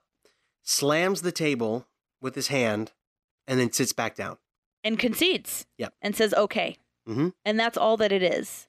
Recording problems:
none

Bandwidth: 14.5 kHz